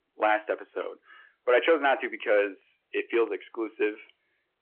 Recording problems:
phone-call audio
distortion; slight; 2% of the sound clipped

